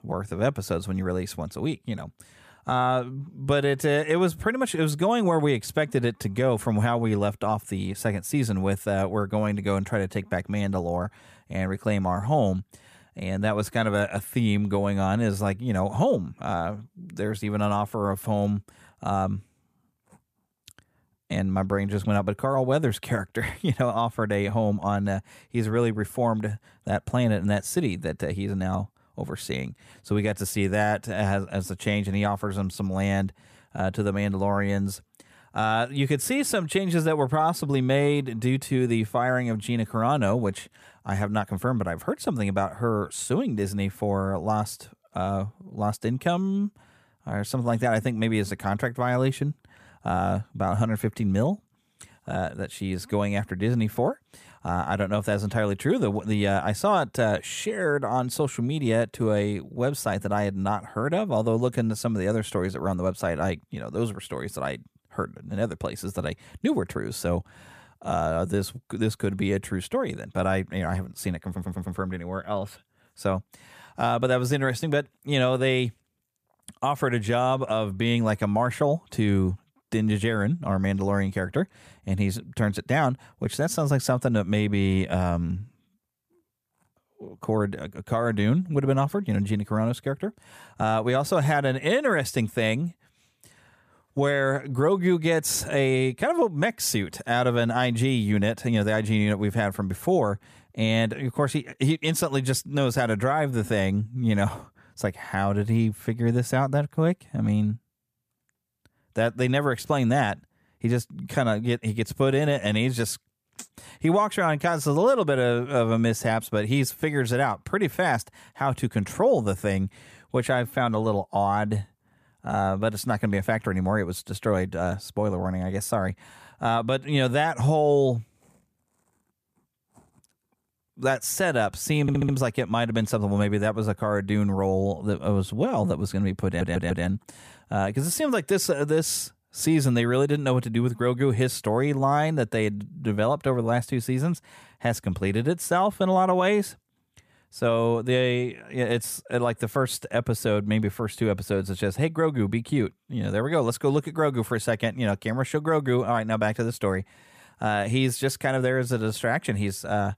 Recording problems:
audio stuttering; at 1:11, at 2:12 and at 2:16

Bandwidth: 14.5 kHz